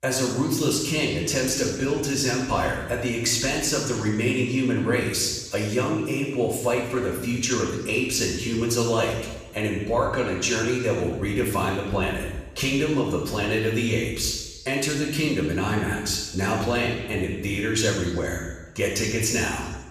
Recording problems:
off-mic speech; far
room echo; noticeable; dies away in 1.1 s

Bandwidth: 14.5 kHz